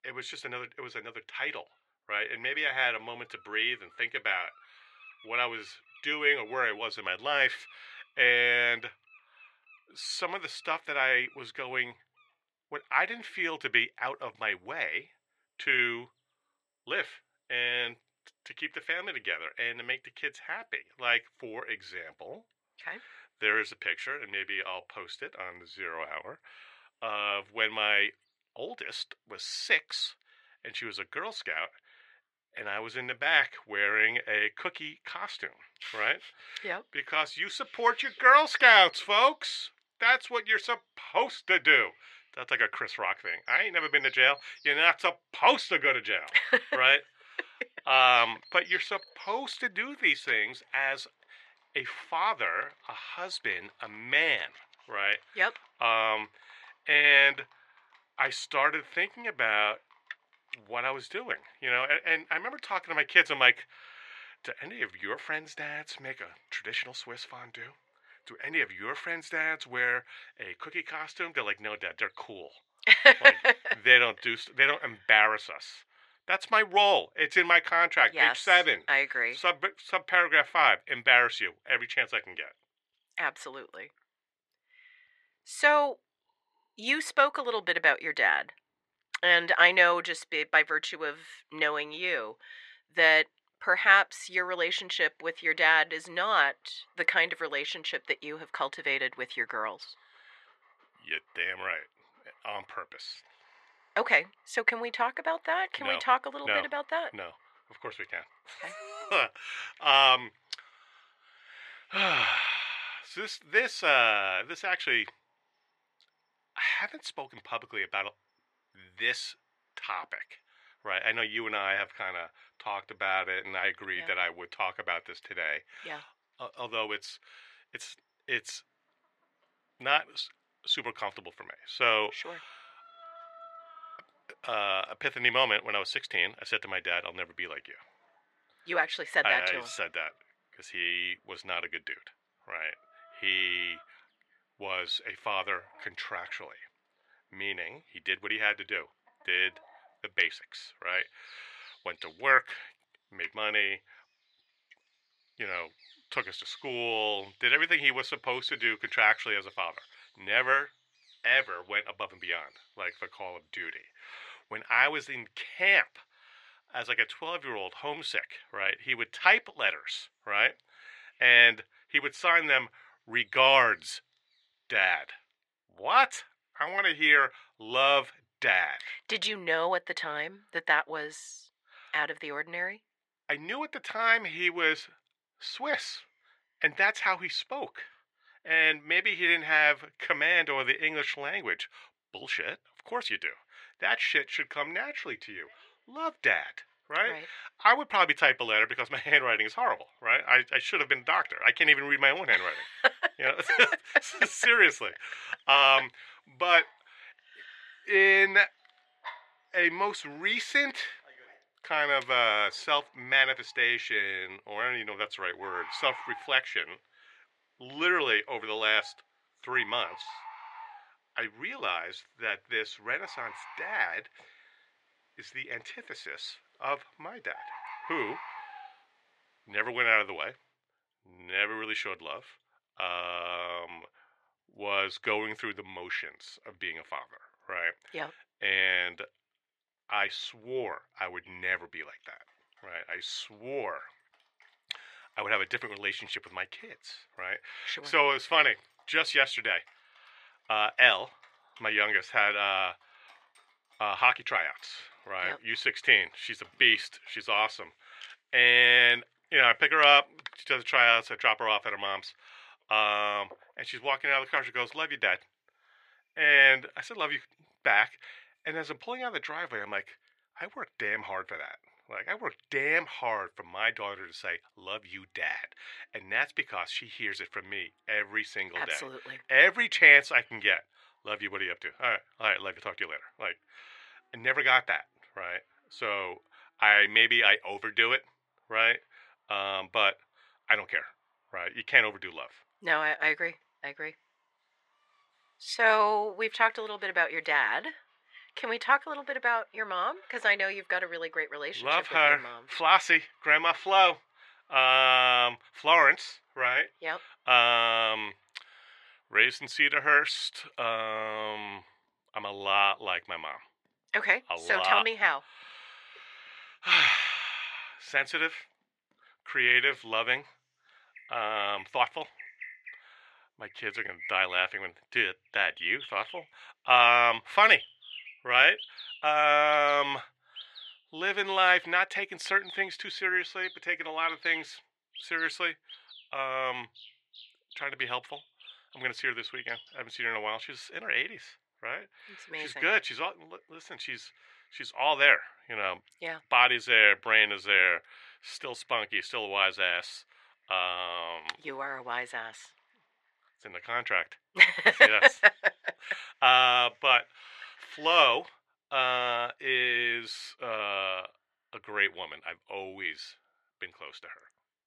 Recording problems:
thin; very; fading below 650 Hz
muffled; very slightly; fading above 3.5 kHz
animal sounds; faint; throughout; 25 dB below the speech

